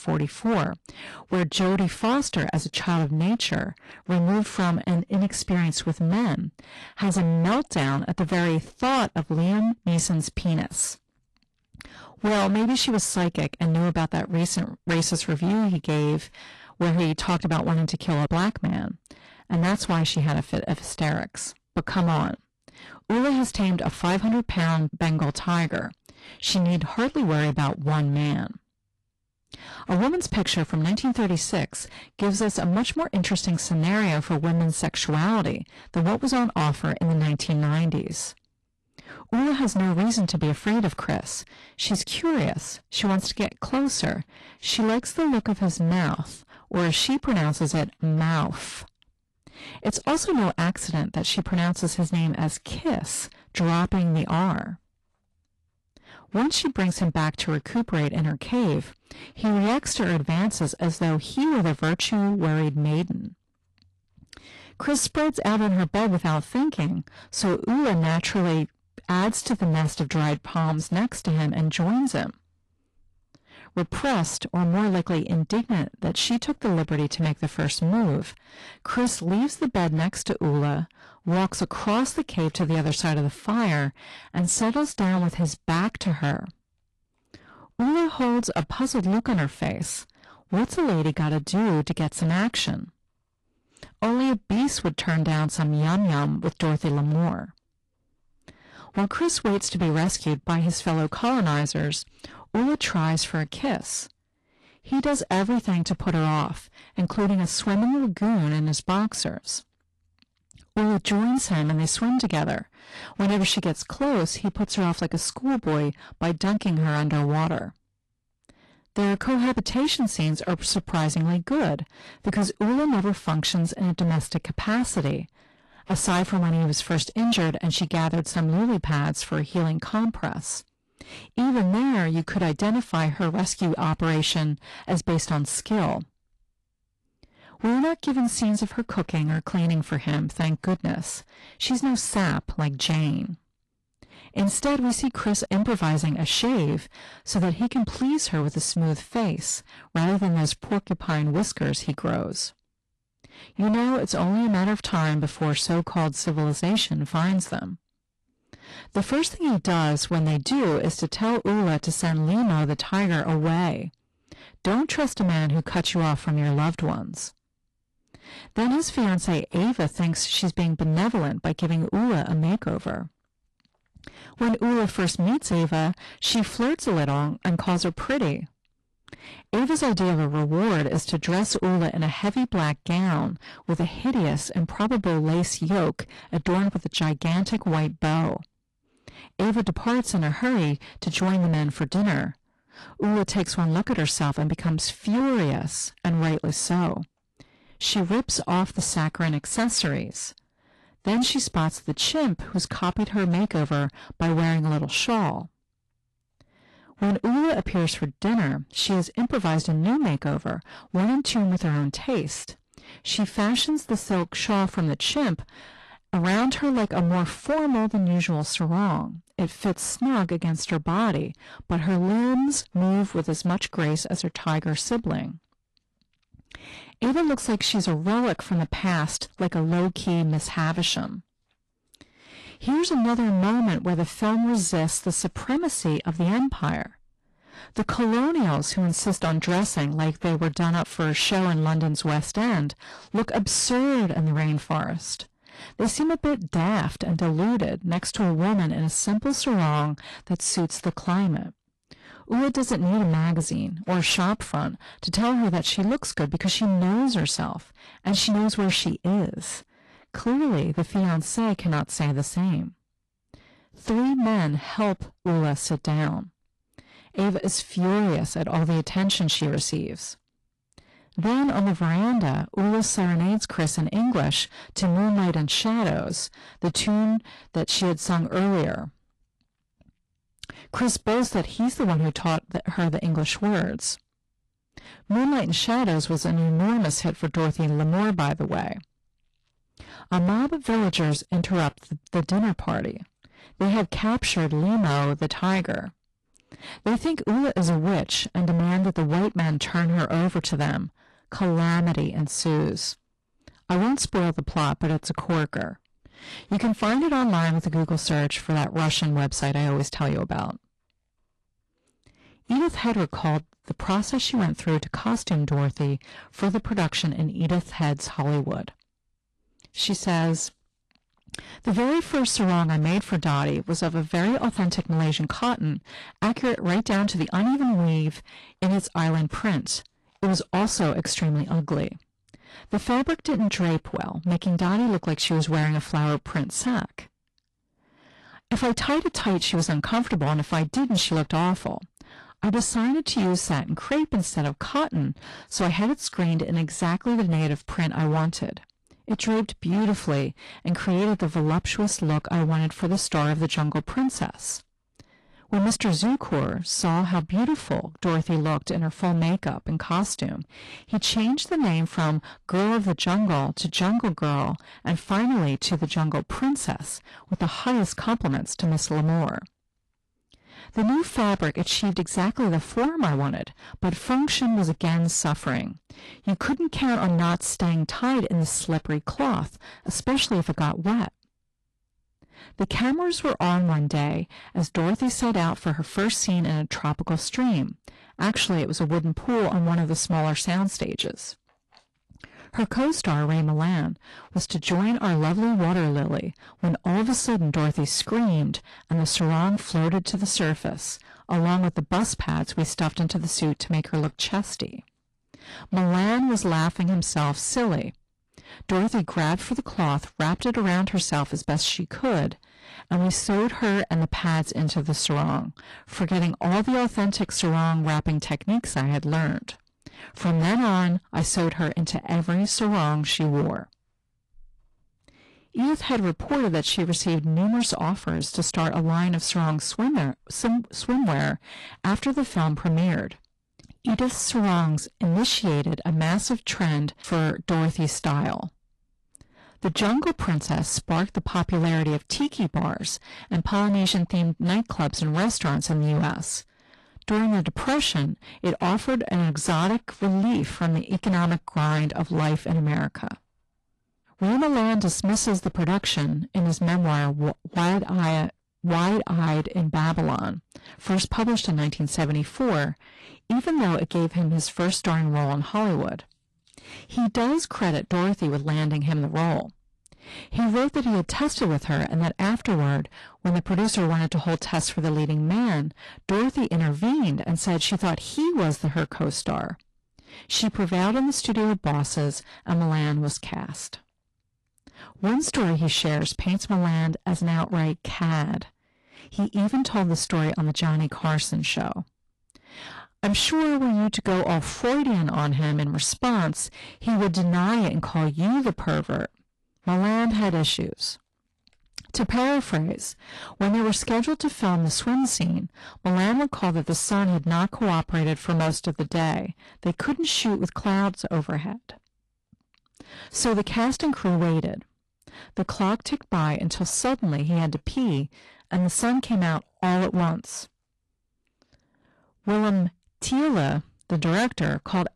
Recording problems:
distortion; heavy; 21% of the sound clipped
garbled, watery; slightly

